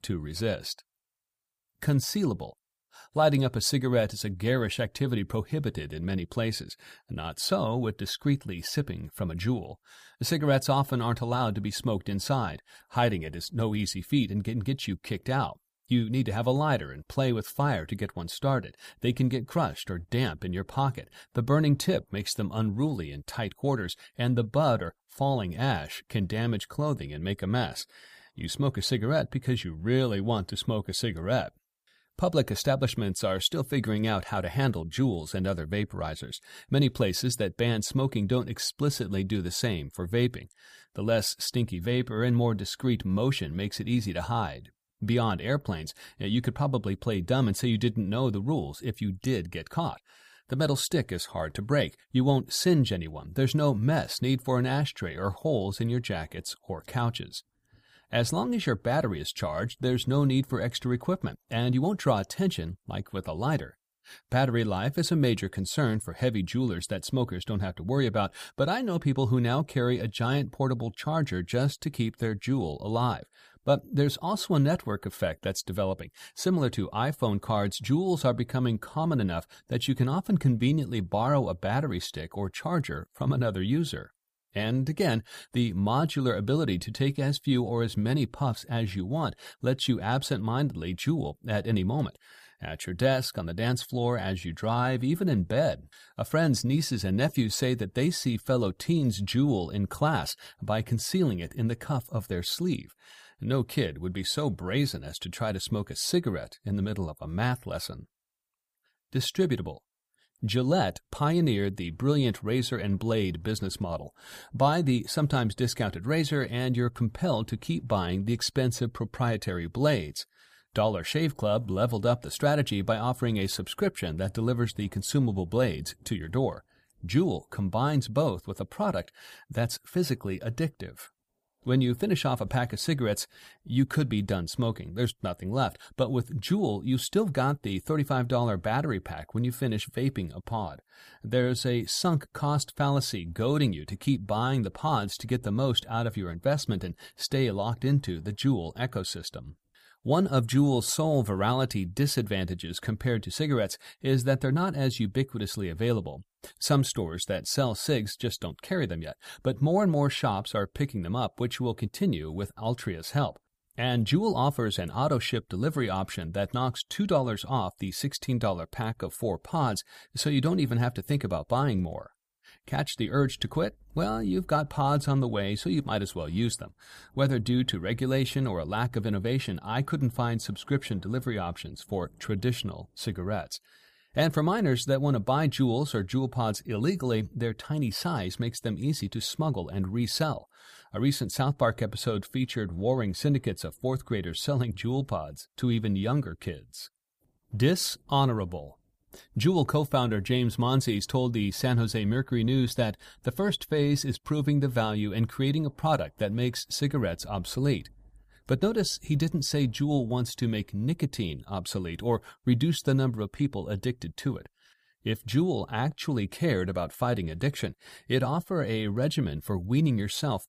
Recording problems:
none

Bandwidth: 15 kHz